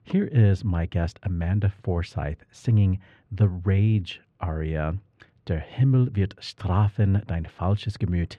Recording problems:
muffled; slightly; fading above 3 kHz

